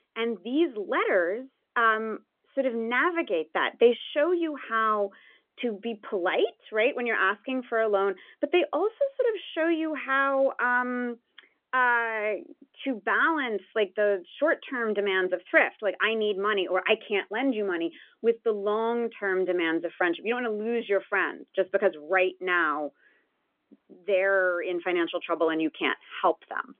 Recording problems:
phone-call audio; nothing above 3.5 kHz

